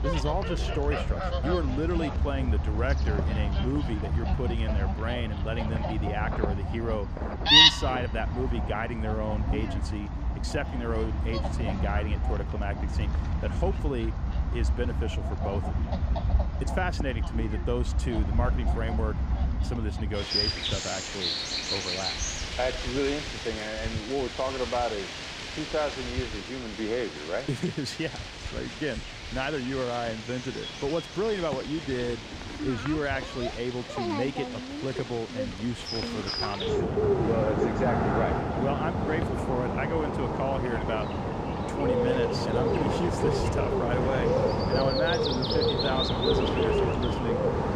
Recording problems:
animal sounds; very loud; throughout; 4 dB above the speech

